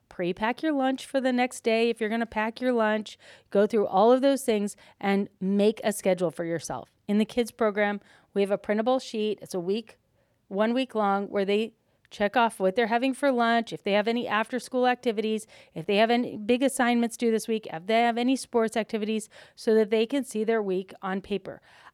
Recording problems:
none

